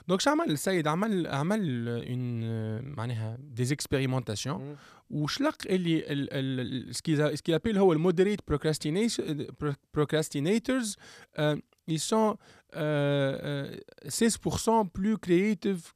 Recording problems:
none

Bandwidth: 14.5 kHz